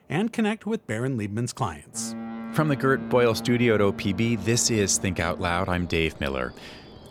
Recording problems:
train or aircraft noise; noticeable; throughout; 15 dB below the speech

